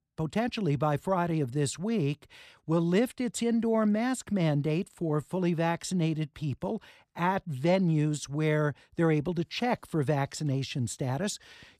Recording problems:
none

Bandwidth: 15 kHz